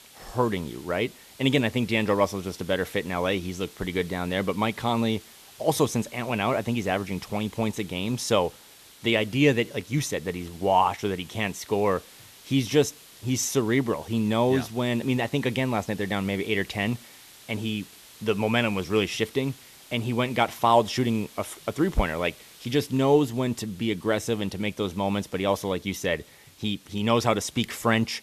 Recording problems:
hiss; faint; throughout; 20 dB below the speech

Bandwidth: 14 kHz